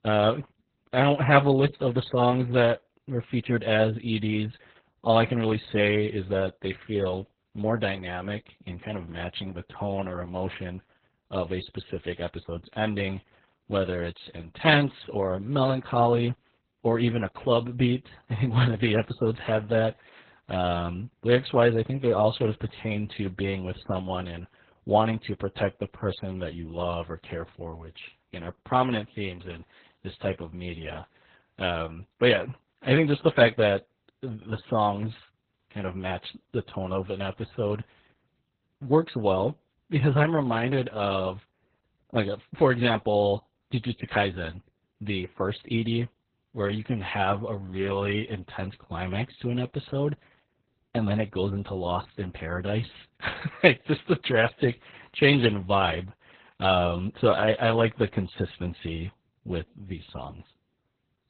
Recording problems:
garbled, watery; badly; nothing above 4 kHz

